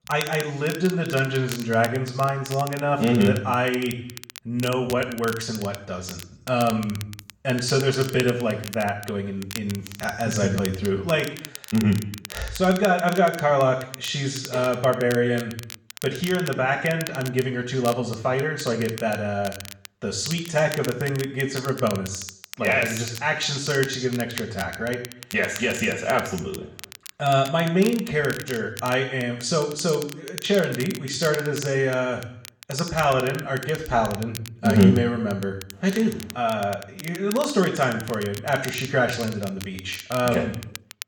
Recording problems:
off-mic speech; far
room echo; noticeable; dies away in 0.7 s
crackle, like an old record; noticeable; 15 dB below the speech

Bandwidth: 17 kHz